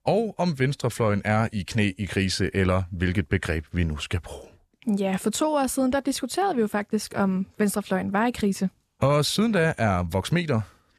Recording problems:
none

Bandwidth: 13.5 kHz